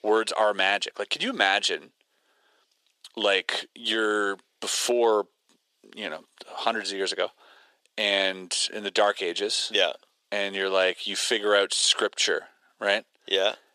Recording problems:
thin; very; fading below 400 Hz

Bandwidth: 14.5 kHz